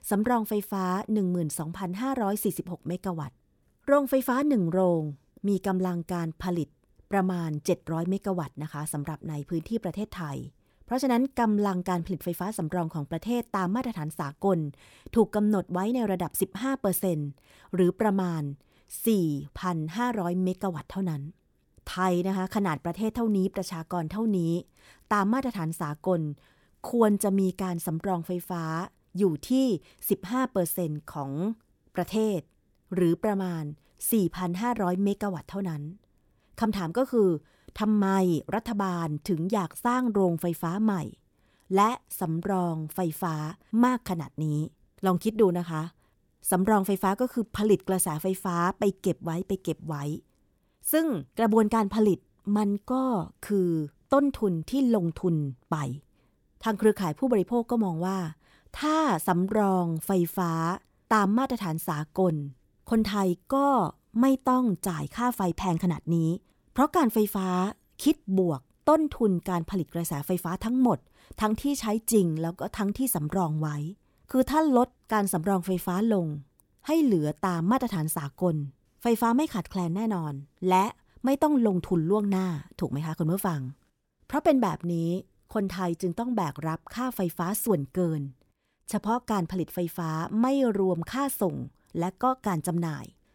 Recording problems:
none

